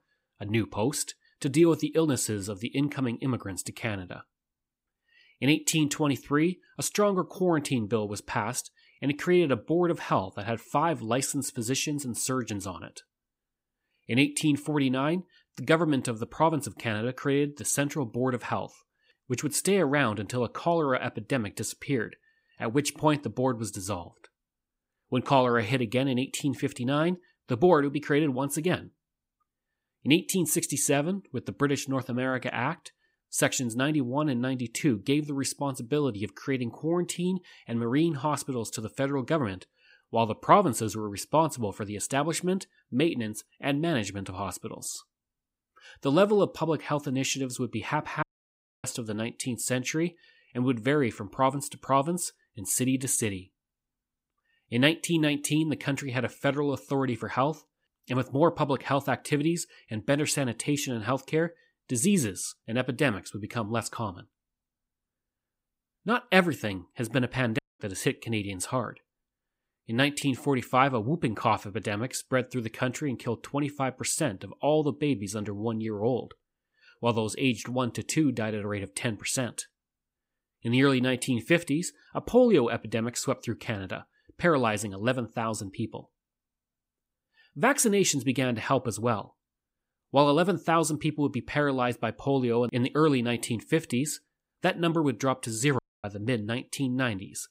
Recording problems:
audio cutting out; at 48 s for 0.5 s, at 1:08 and at 1:36

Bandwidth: 15.5 kHz